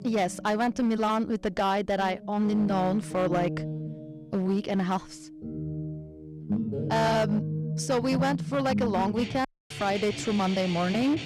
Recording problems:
distortion; slight; 9% of the sound clipped
background music; loud; throughout; 6 dB below the speech
audio cutting out; at 9.5 s

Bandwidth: 14.5 kHz